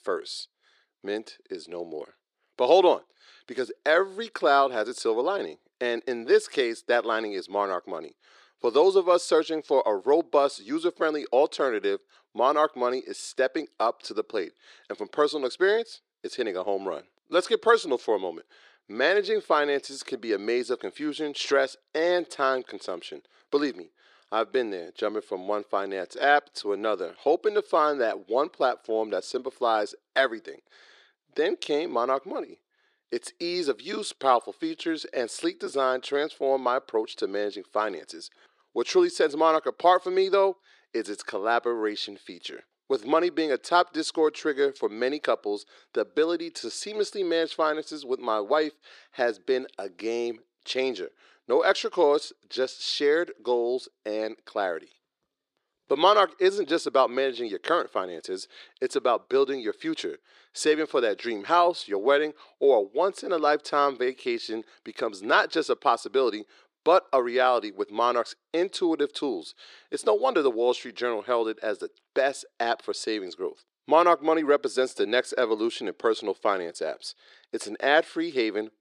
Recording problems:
thin; somewhat; fading below 350 Hz

